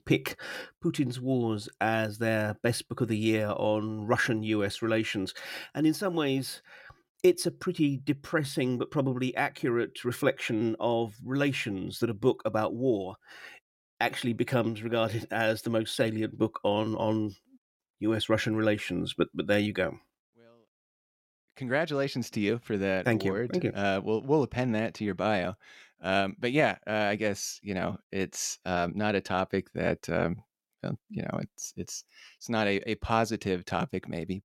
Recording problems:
none

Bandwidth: 16.5 kHz